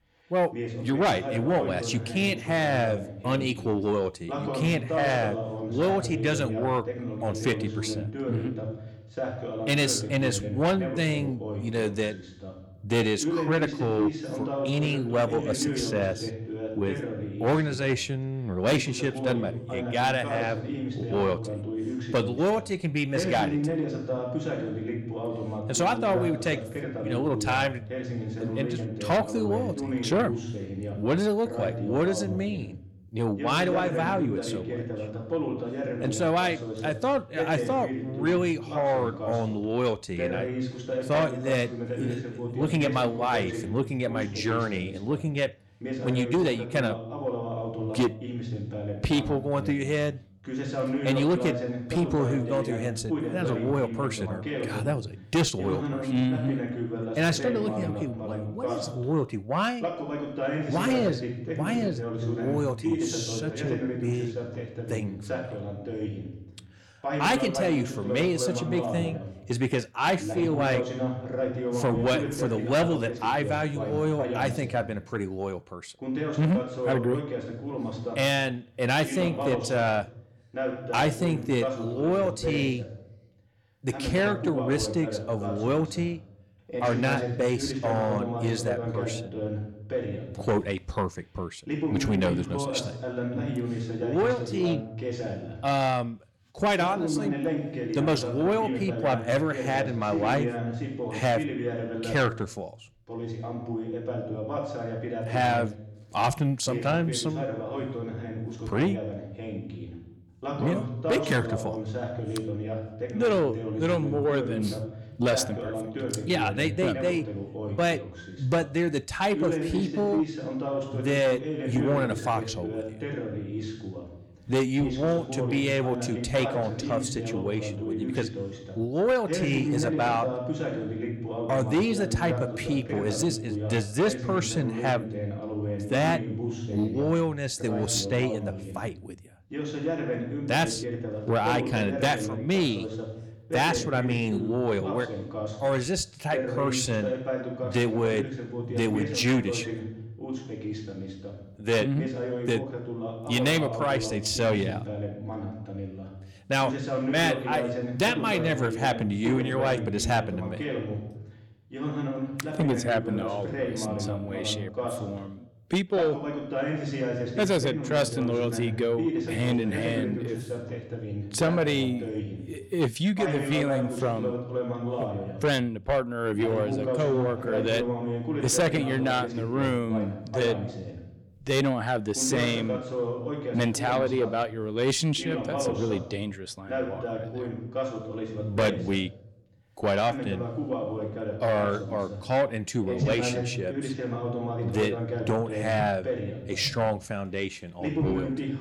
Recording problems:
distortion; slight; 10 dB below the speech
voice in the background; loud; throughout; 5 dB below the speech

